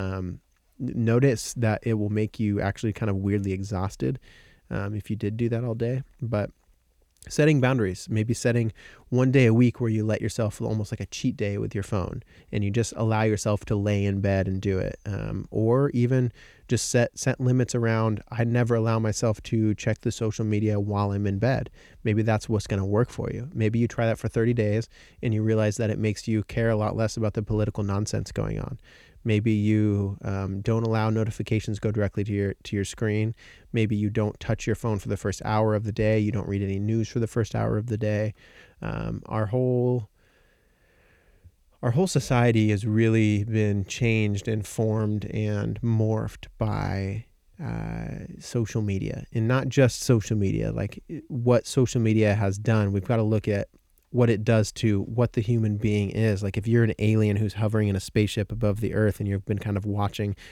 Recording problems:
abrupt cut into speech; at the start

